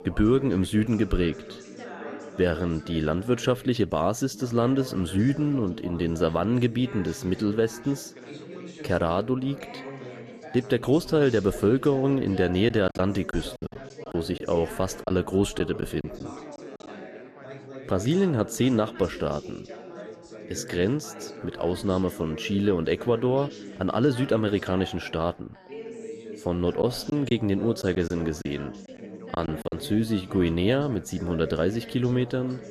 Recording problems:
background chatter; noticeable; throughout; 4 voices, 15 dB below the speech
choppy; very; from 13 to 16 s and from 27 to 30 s; 10% of the speech affected

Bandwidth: 13.5 kHz